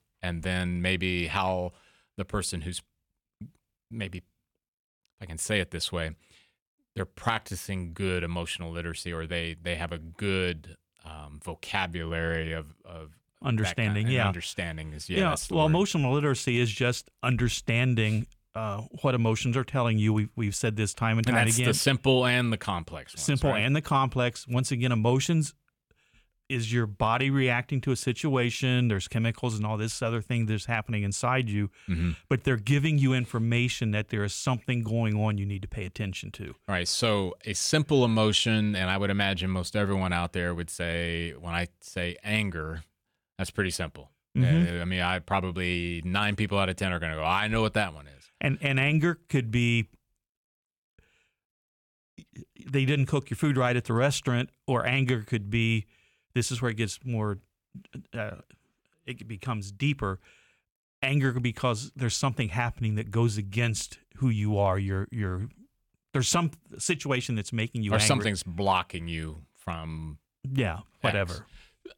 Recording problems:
none

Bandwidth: 18 kHz